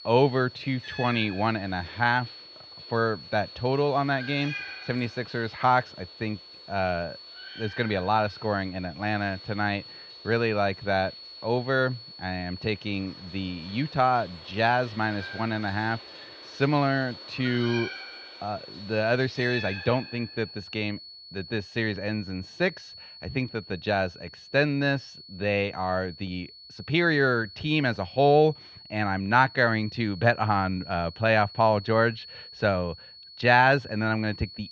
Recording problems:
muffled; very slightly; fading above 4 kHz
high-pitched whine; noticeable; throughout; 4.5 kHz, 15 dB below the speech
animal sounds; noticeable; until 20 s; 15 dB below the speech

